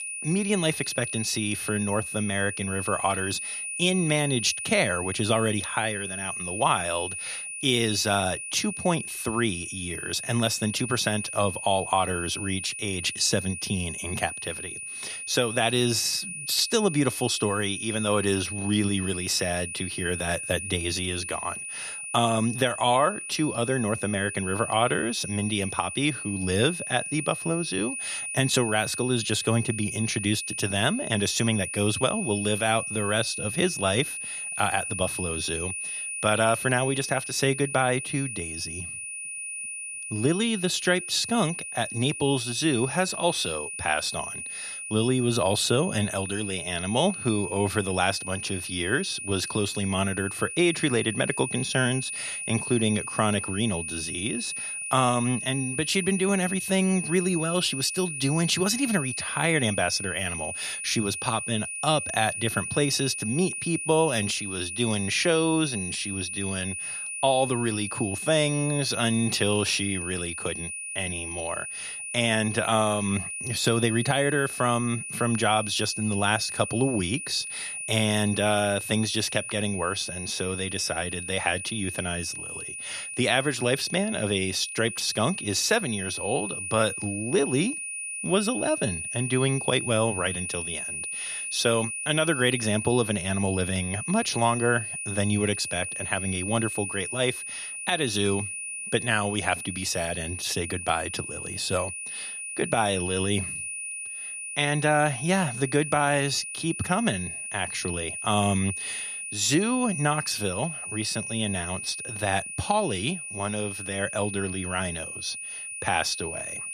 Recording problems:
high-pitched whine; loud; throughout; 2.5 kHz, 5 dB below the speech

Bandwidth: 14 kHz